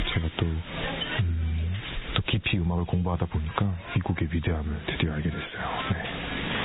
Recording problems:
garbled, watery; badly
high frequencies cut off; severe; nothing above 4 kHz
squashed, flat; heavily
hiss; loud; throughout; 6 dB below the speech

